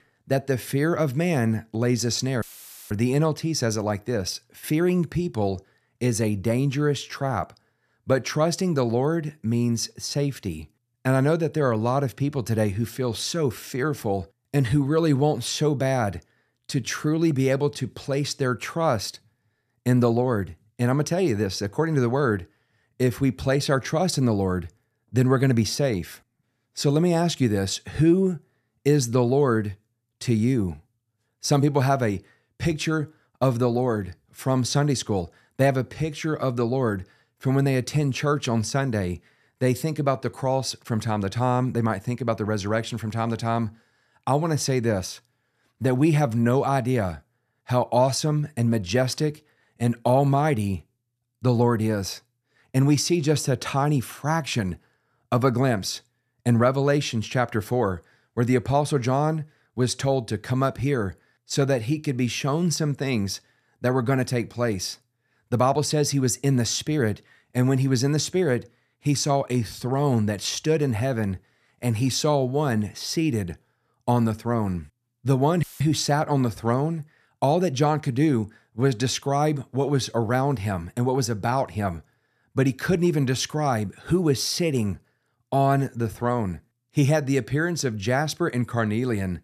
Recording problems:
audio cutting out; filled with static; at 2.5 s and at 1:16

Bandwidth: 14.5 kHz